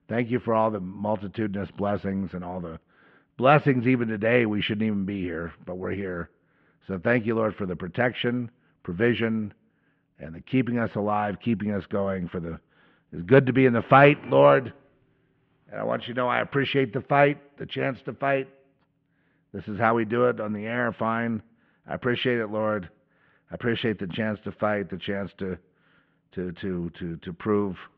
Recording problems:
muffled; very; fading above 3 kHz

